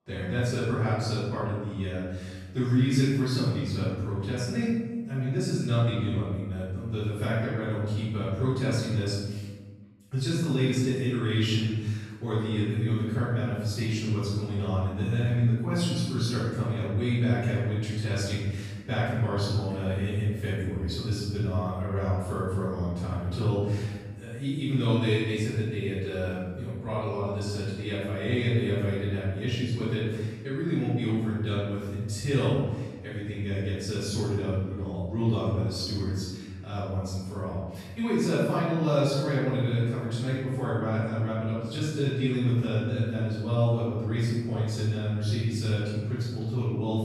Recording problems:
room echo; strong; dies away in 1.3 s
off-mic speech; far

